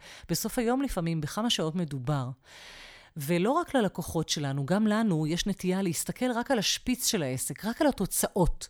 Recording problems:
none

